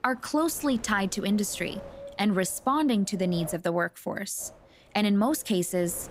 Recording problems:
wind noise on the microphone; occasional gusts; until 3.5 s and from 4.5 s on; 20 dB below the speech

